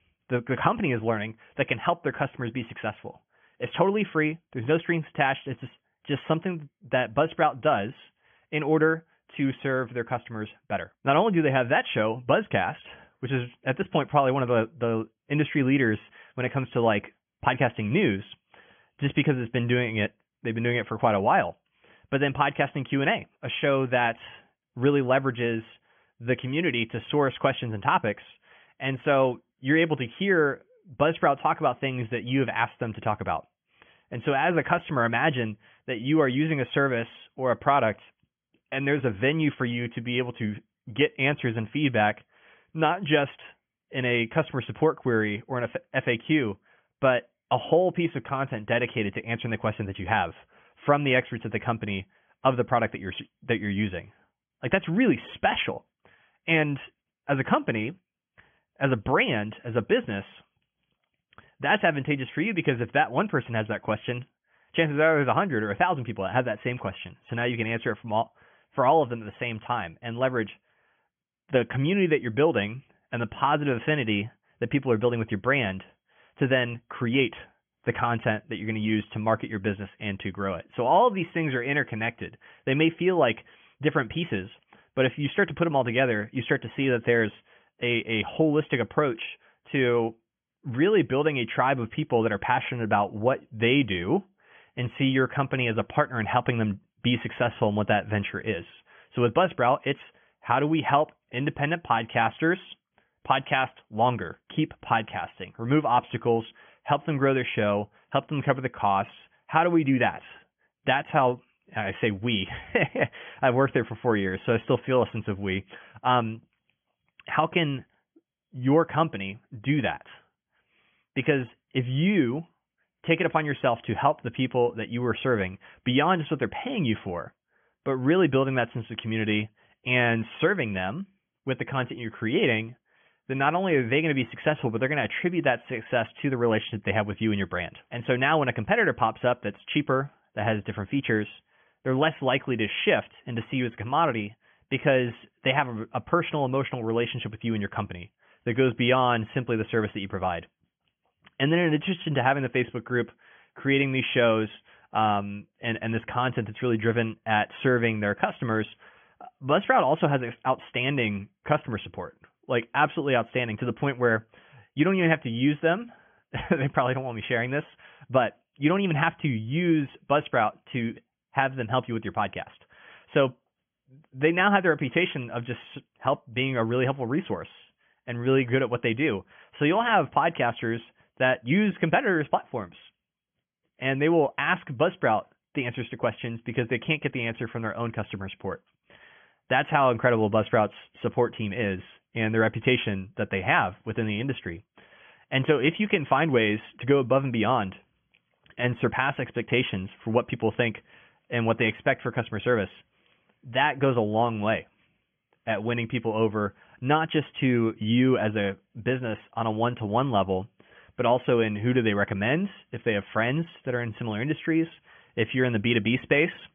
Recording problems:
high frequencies cut off; severe; nothing above 3.5 kHz

